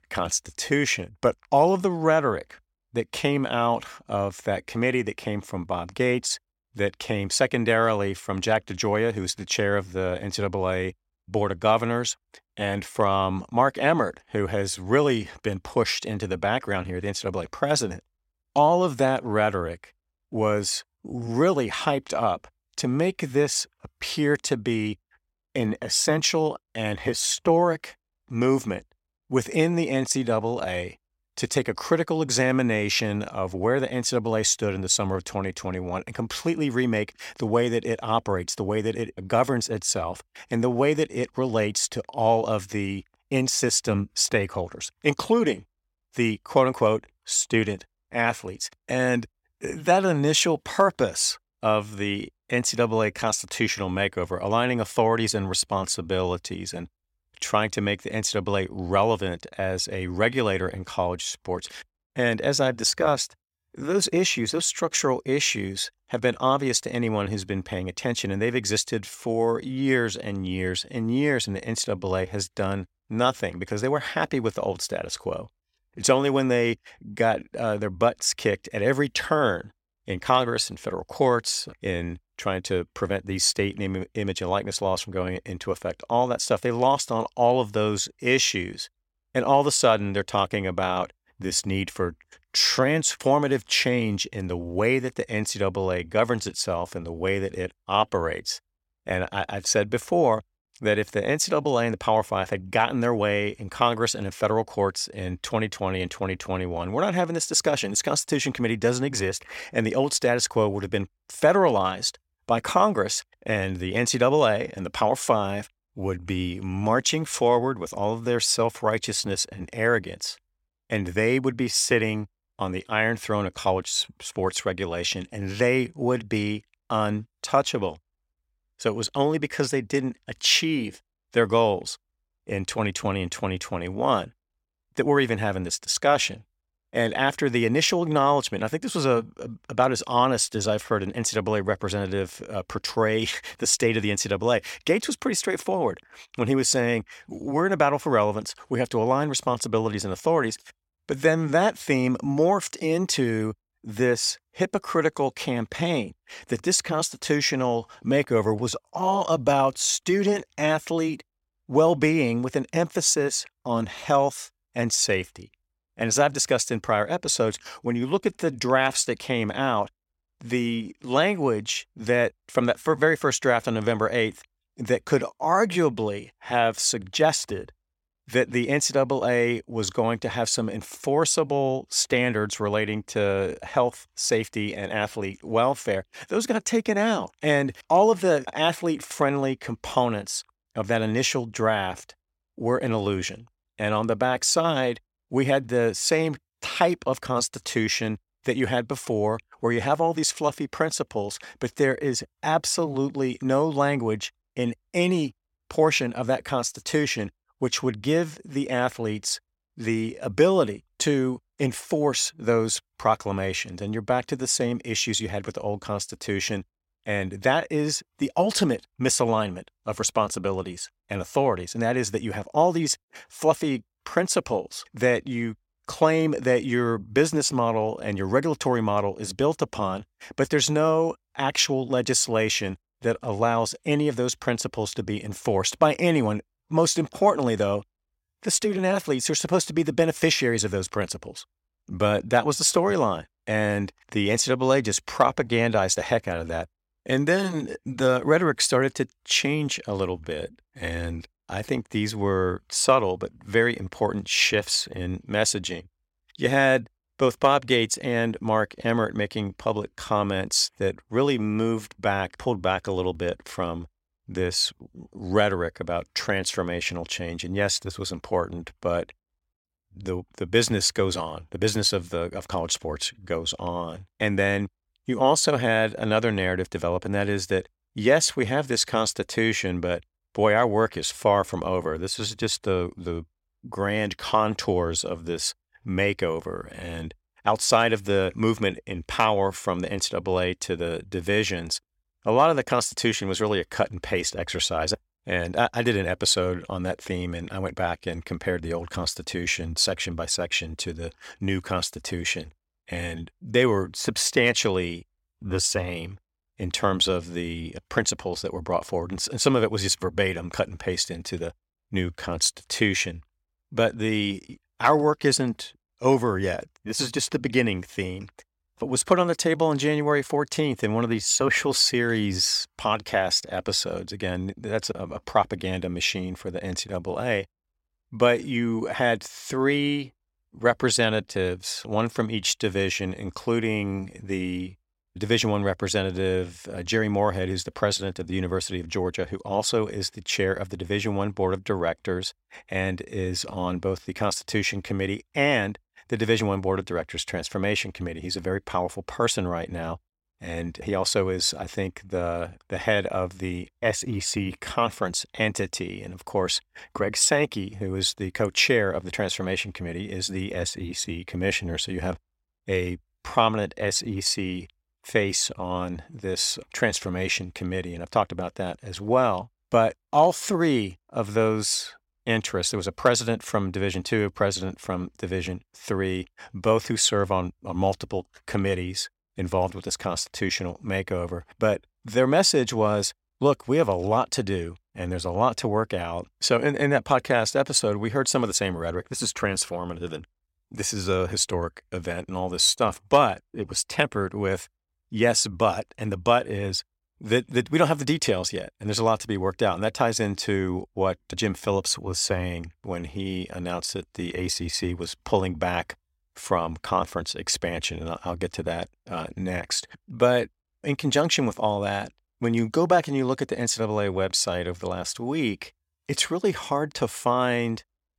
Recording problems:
none

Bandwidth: 16.5 kHz